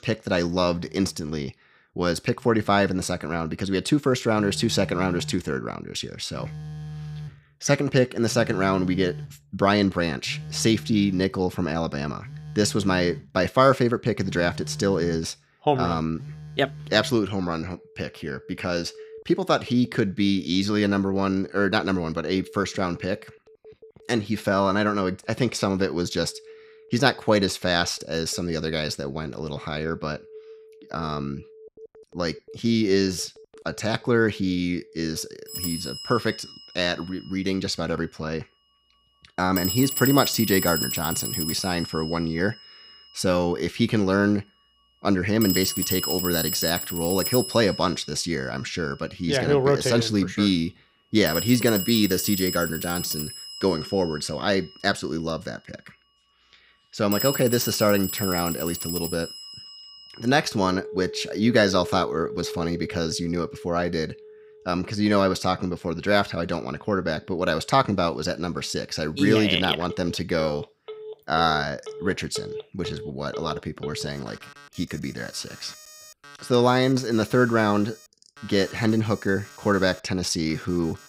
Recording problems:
alarms or sirens; loud; throughout; 9 dB below the speech

